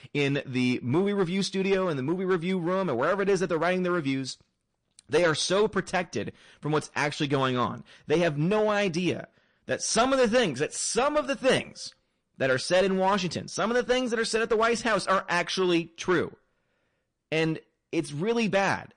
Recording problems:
distortion; slight; 5% of the sound clipped
garbled, watery; slightly; nothing above 9 kHz

